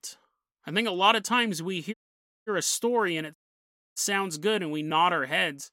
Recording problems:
audio cutting out; at 2 s for 0.5 s and at 3.5 s for 0.5 s

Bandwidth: 16 kHz